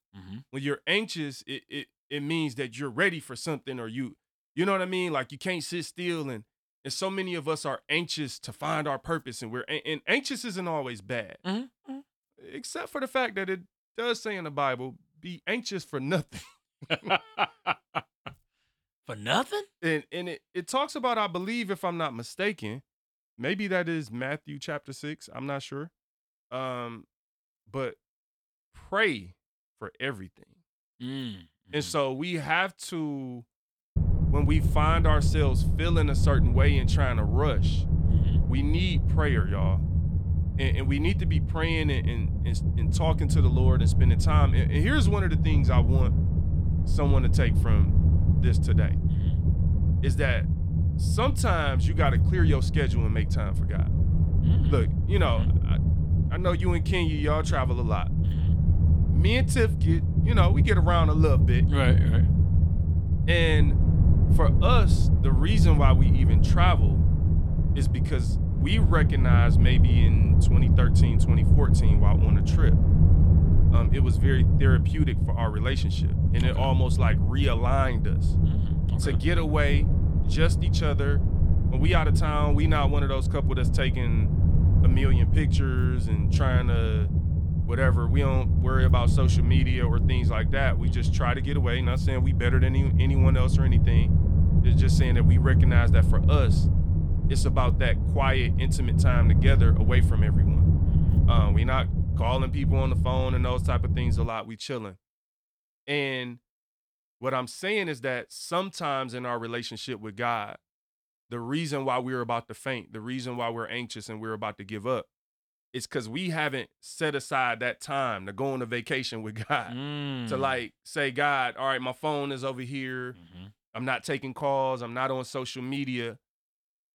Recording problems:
low rumble; loud; from 34 s to 1:44; 6 dB below the speech

